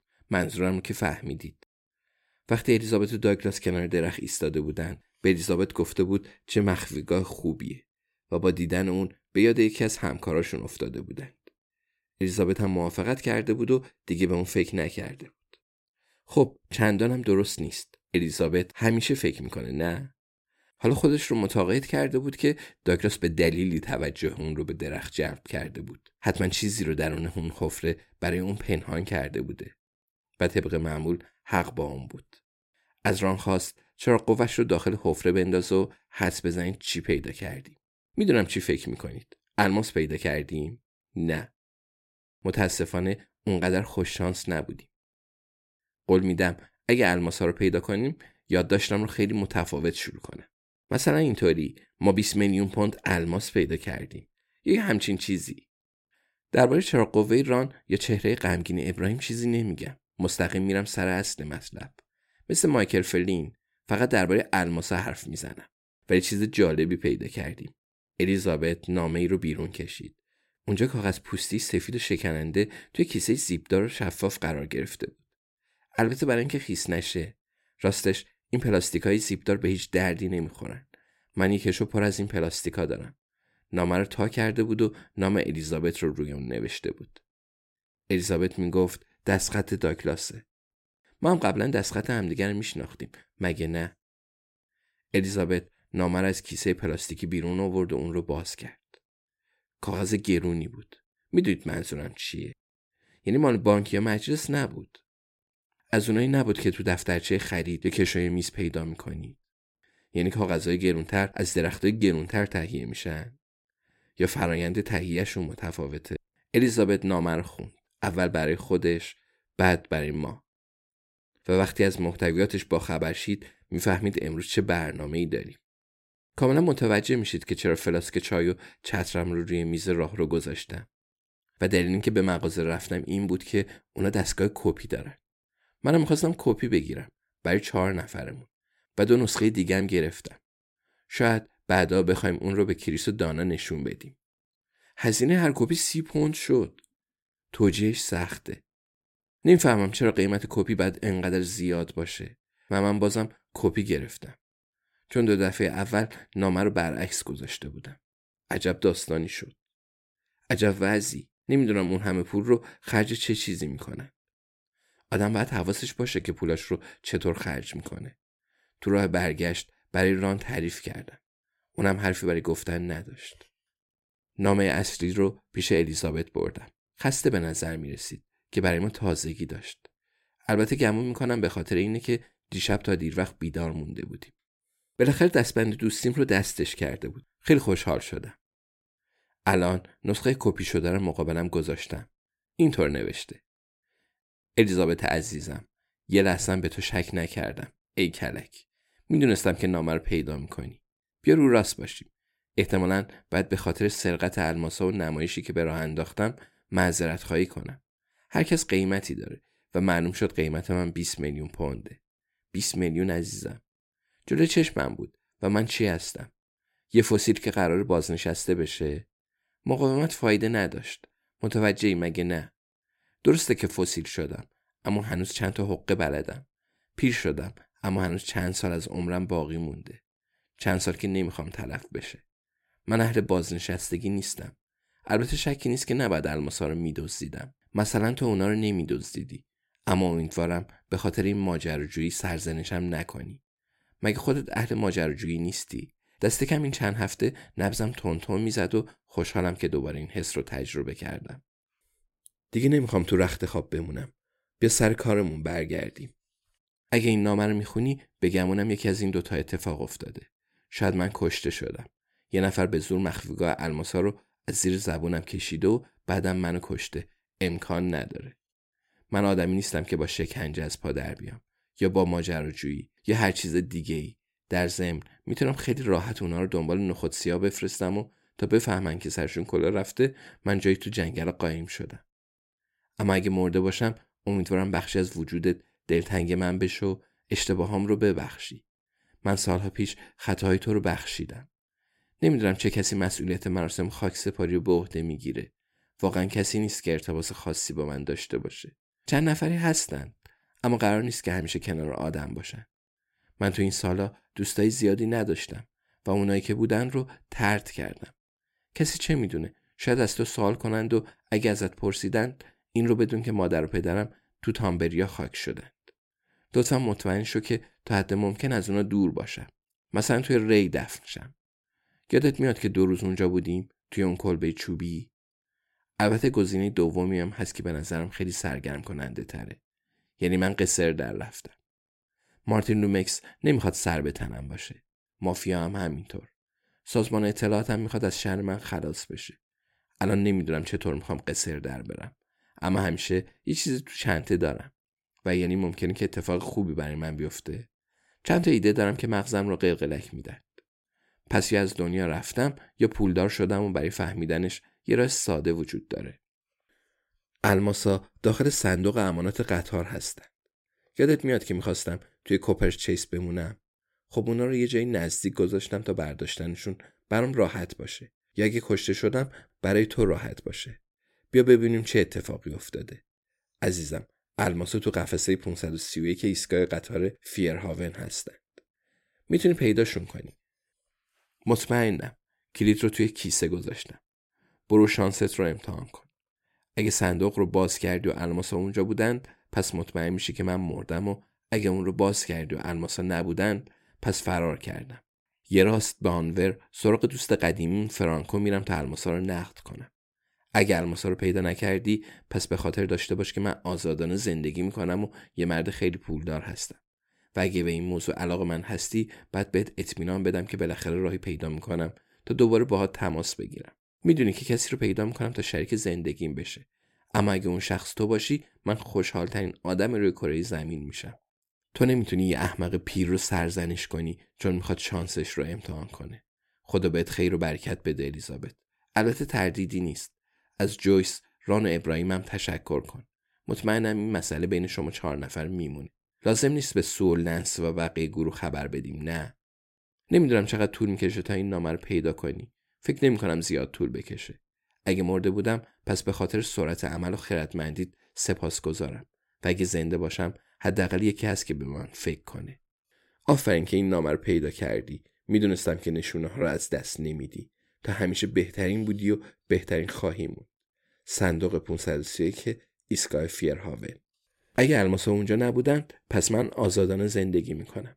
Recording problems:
none

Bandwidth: 16 kHz